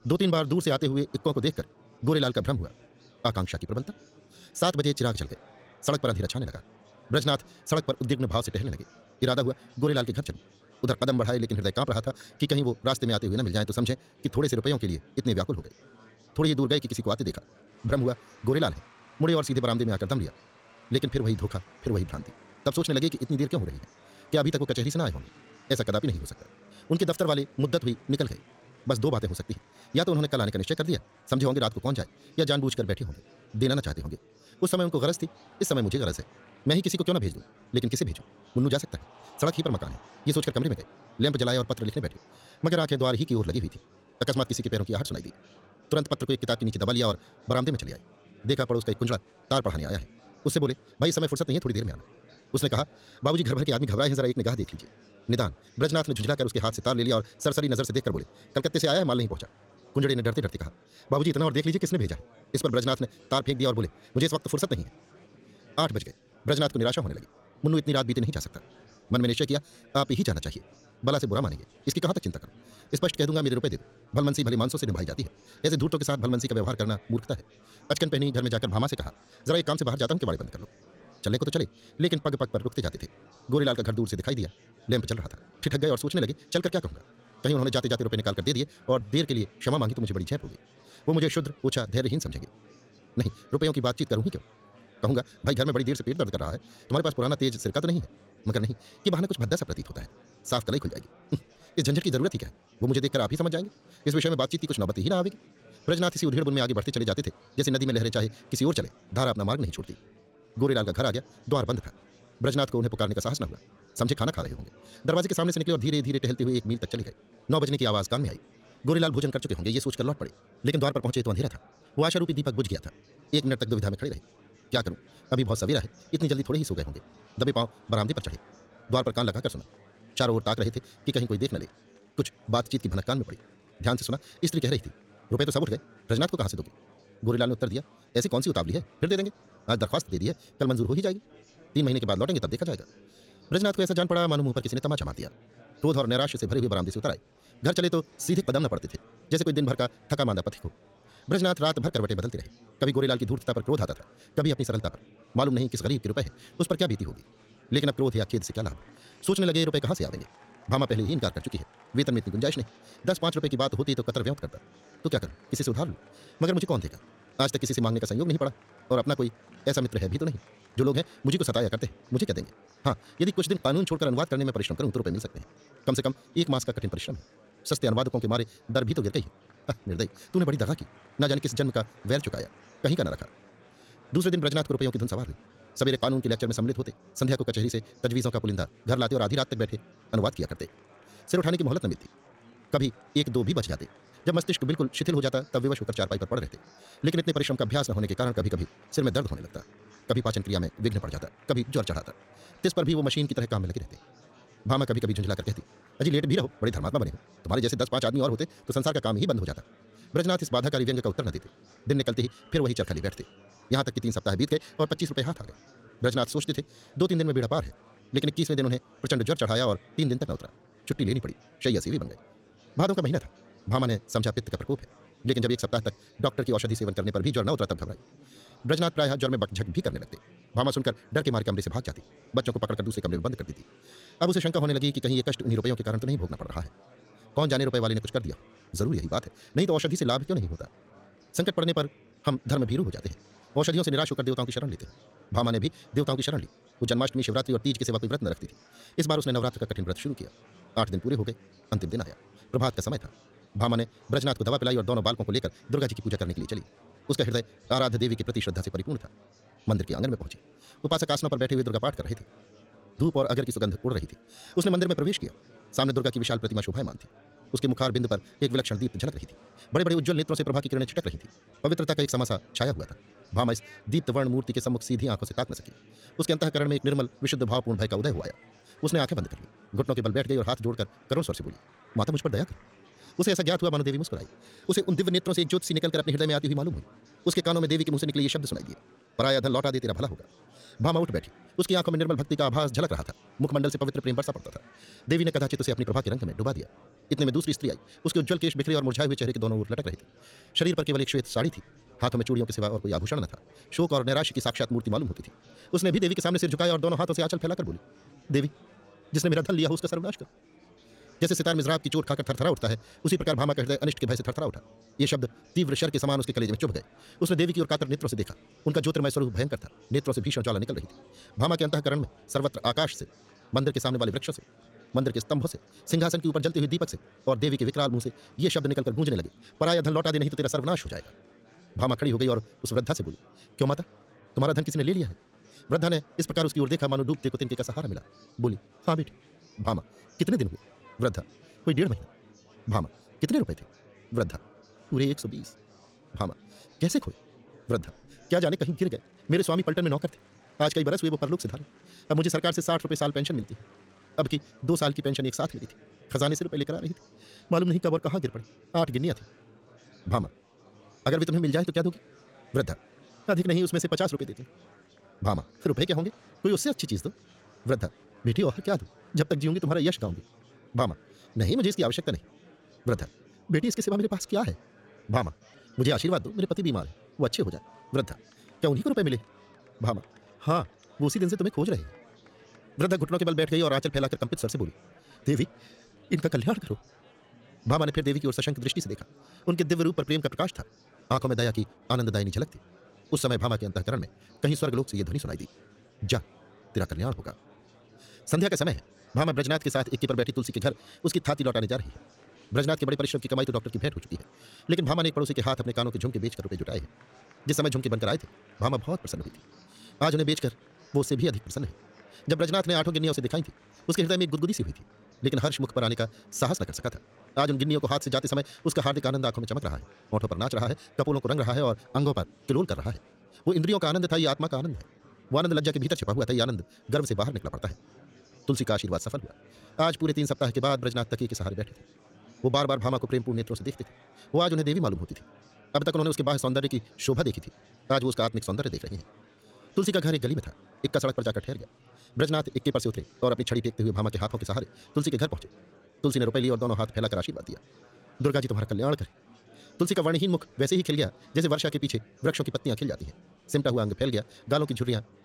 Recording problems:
wrong speed, natural pitch; too fast; 1.8 times normal speed
murmuring crowd; faint; throughout; 25 dB below the speech

